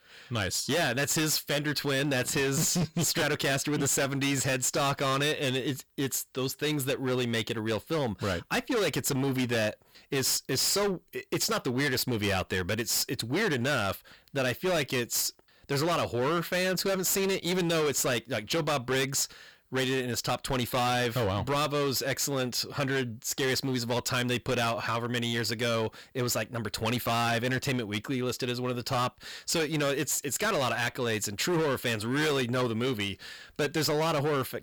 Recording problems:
distortion; heavy; 20% of the sound clipped

